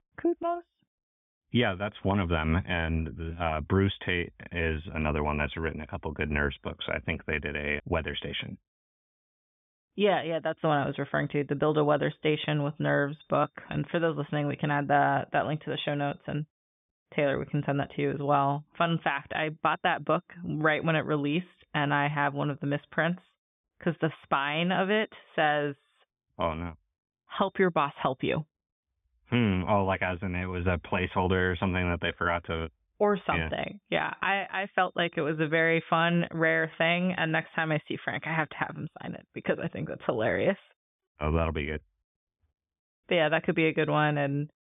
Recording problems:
high frequencies cut off; severe; nothing above 3.5 kHz

